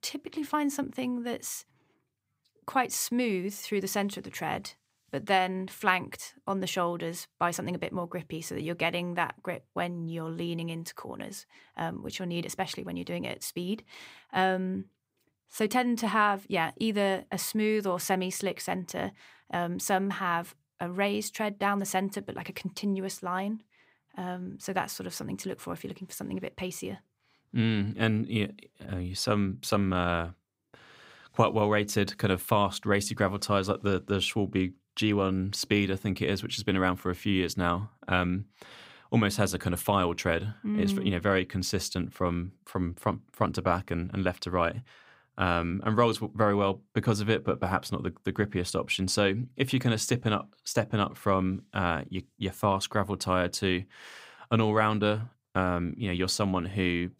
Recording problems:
none

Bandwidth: 15.5 kHz